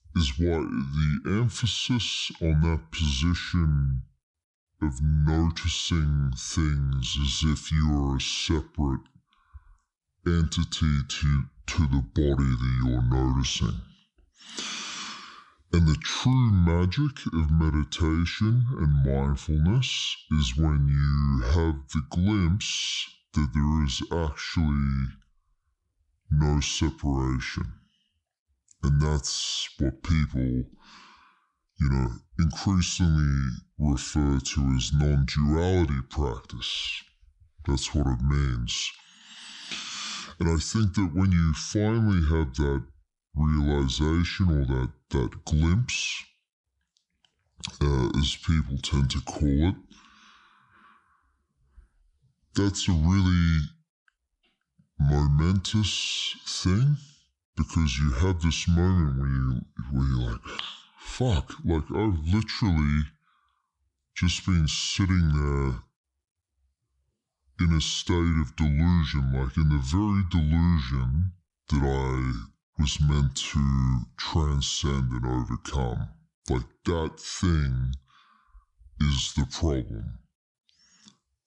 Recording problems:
wrong speed and pitch; too slow and too low; 0.7 times normal speed

